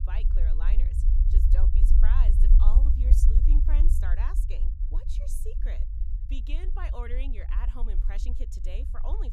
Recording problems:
low rumble; loud; throughout; 3 dB below the speech

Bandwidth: 15.5 kHz